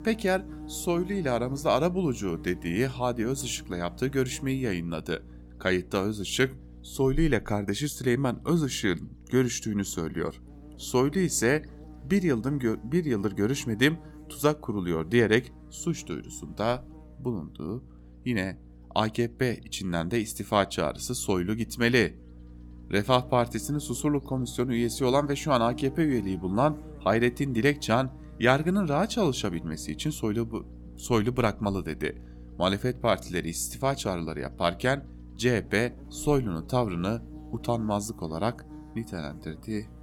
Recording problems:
electrical hum; faint; throughout; 60 Hz, 25 dB below the speech

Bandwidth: 17.5 kHz